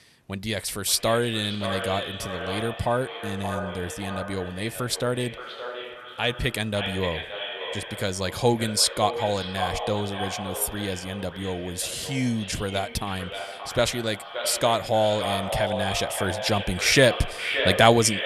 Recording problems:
echo of what is said; strong; throughout; 570 ms later, 7 dB below the speech

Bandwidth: 13.5 kHz